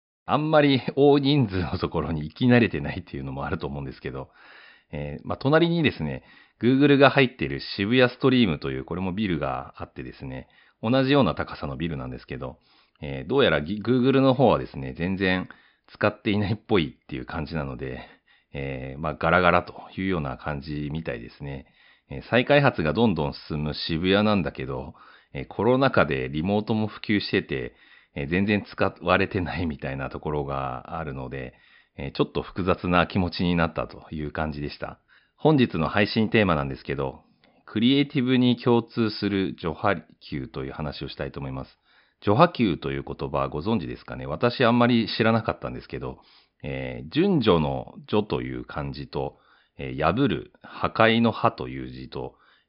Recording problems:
high frequencies cut off; noticeable; nothing above 5.5 kHz

